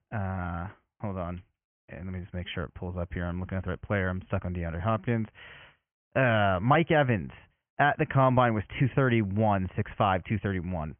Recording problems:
high frequencies cut off; severe; nothing above 3 kHz

